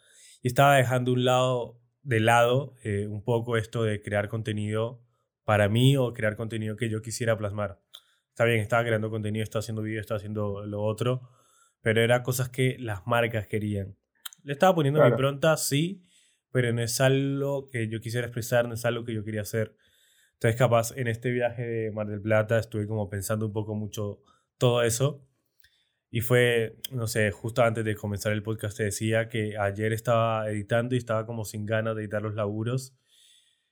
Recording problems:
none

